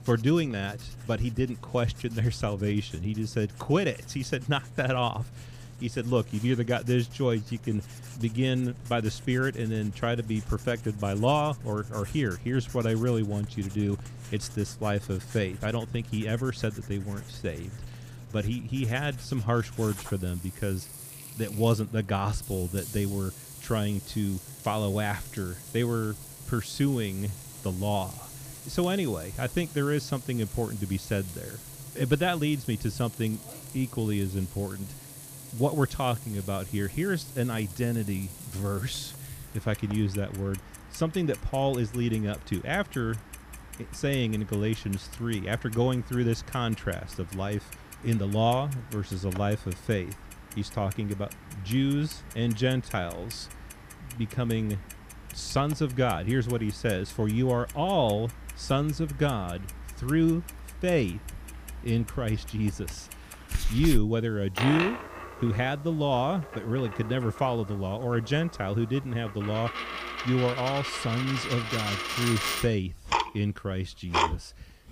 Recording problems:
household noises; noticeable; throughout; 10 dB below the speech

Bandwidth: 15 kHz